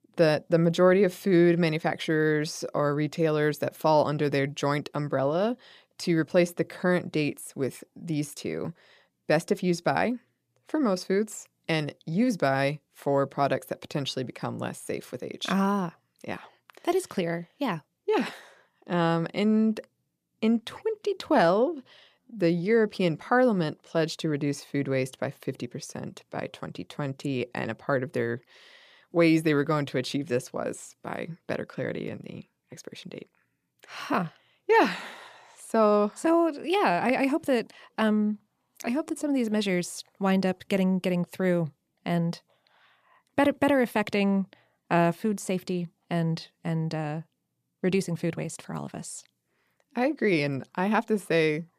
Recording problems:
uneven, jittery; strongly; from 21 to 39 s

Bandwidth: 14.5 kHz